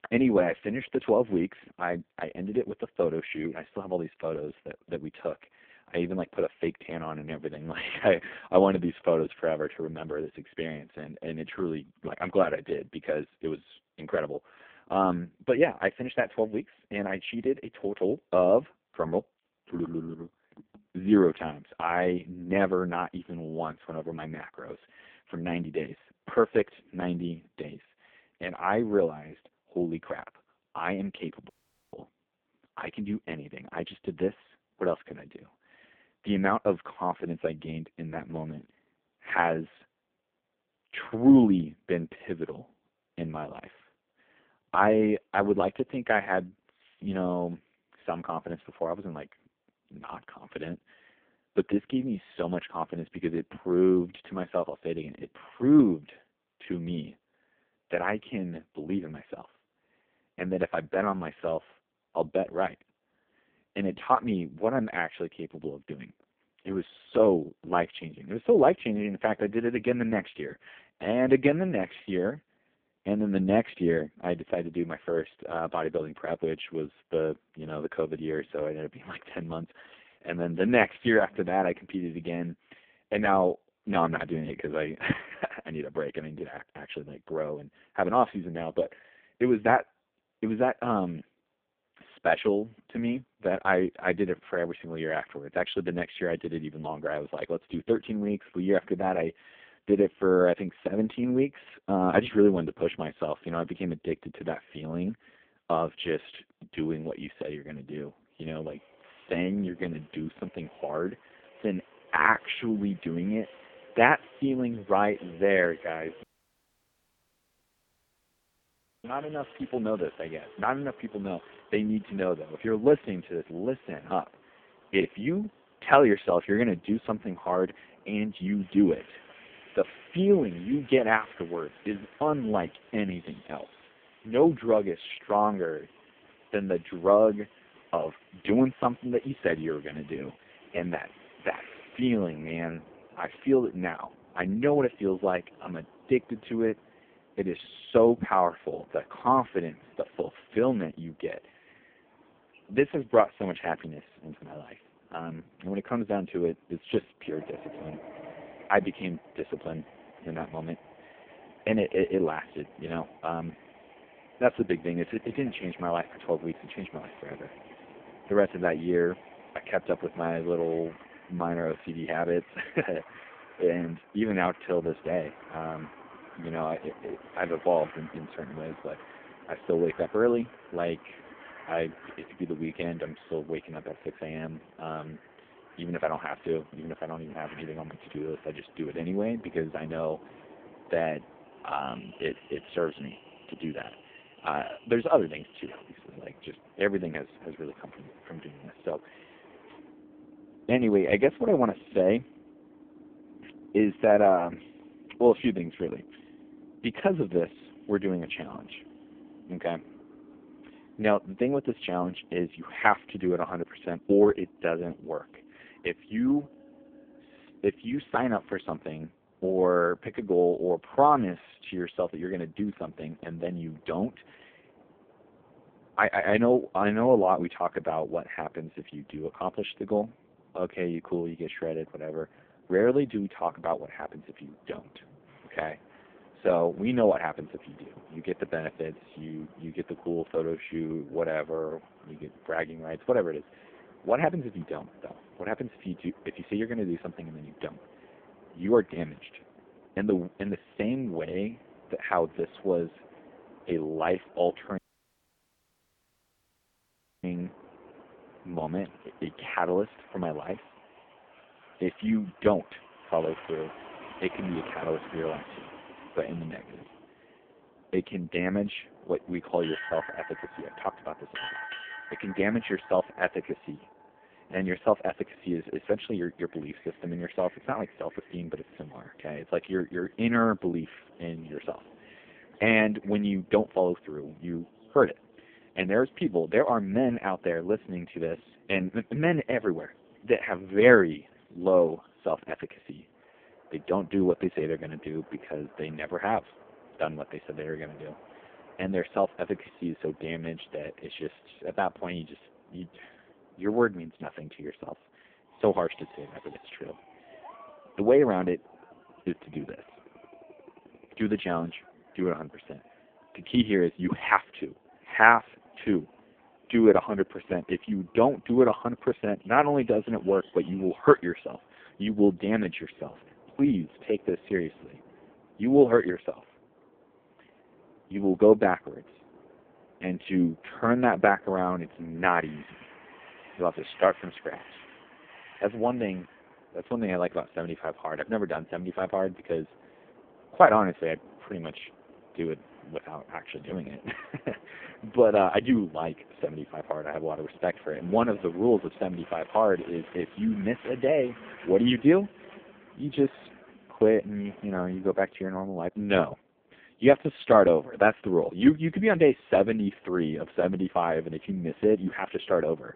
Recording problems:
phone-call audio; poor line
train or aircraft noise; faint; from 1:48 on; 25 dB below the speech
audio cutting out; at 32 s, at 1:56 for 3 s and at 4:15 for 2.5 s

